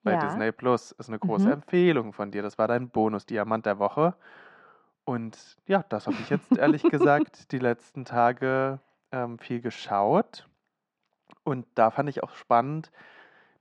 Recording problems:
muffled; very; fading above 1.5 kHz

